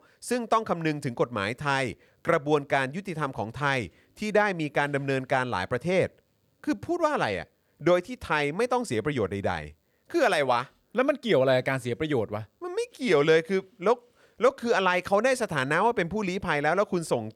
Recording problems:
none

